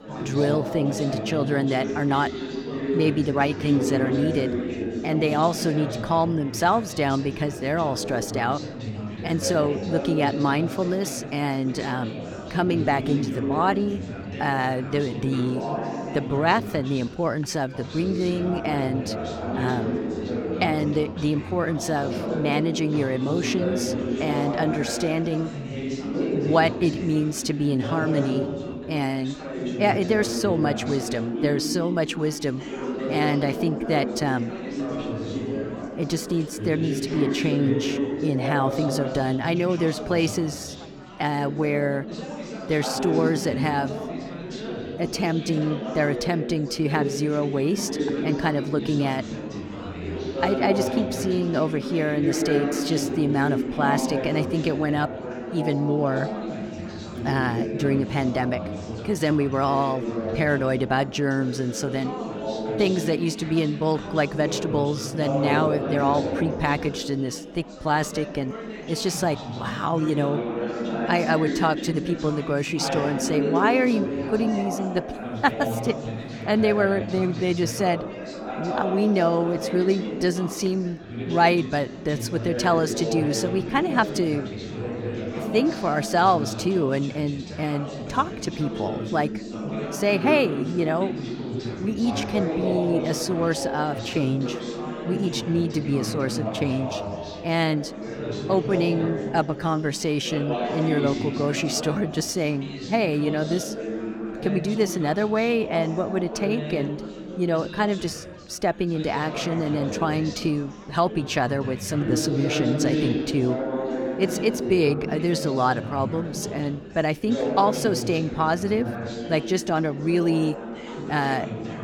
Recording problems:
chatter from many people; loud; throughout; 5 dB below the speech

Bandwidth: 18 kHz